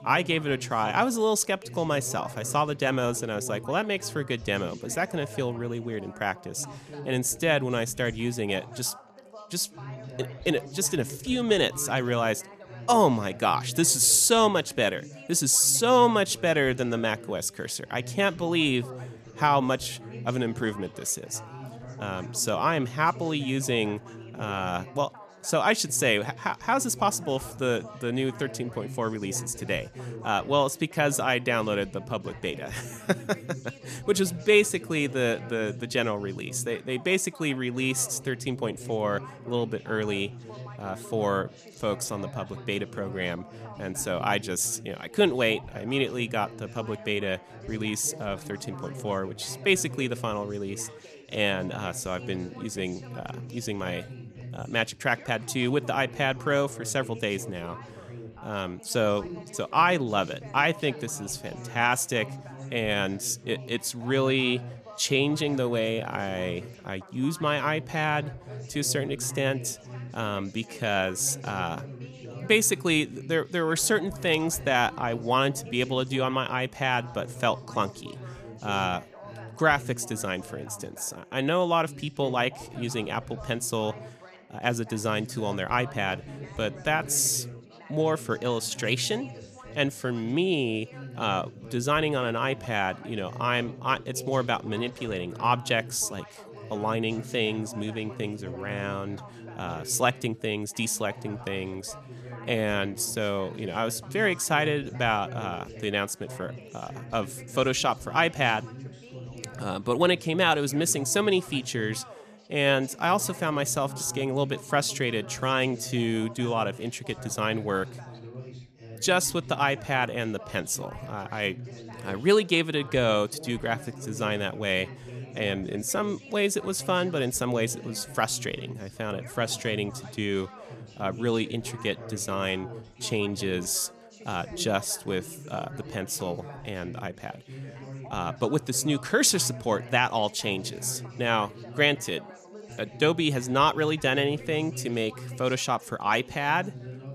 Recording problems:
background chatter; noticeable; throughout; 4 voices, 15 dB below the speech

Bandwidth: 14.5 kHz